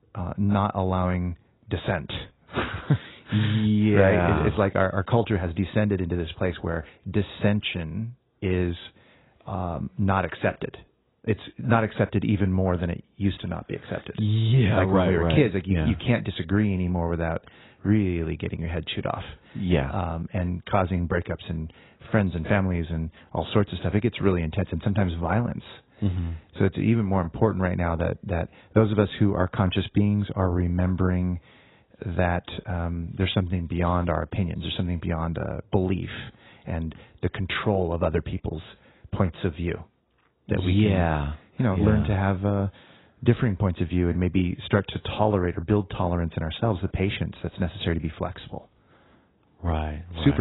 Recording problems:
garbled, watery; badly; nothing above 4 kHz
abrupt cut into speech; at the end

